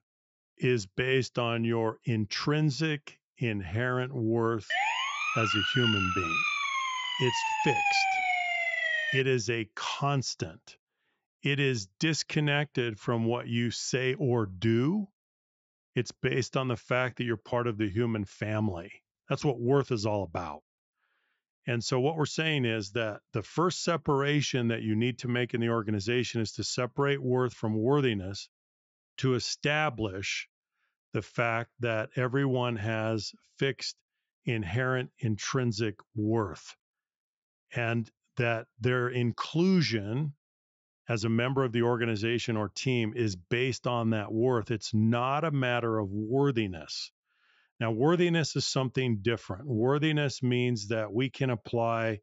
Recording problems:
high frequencies cut off; noticeable; nothing above 8 kHz
siren; loud; from 4.5 to 9 s; peak 4 dB above the speech

